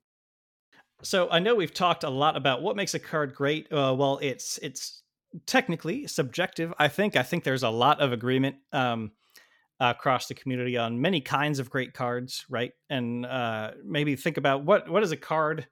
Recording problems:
none

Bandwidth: 17.5 kHz